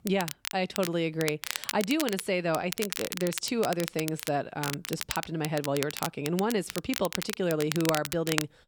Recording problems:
crackle, like an old record; loud; 6 dB below the speech

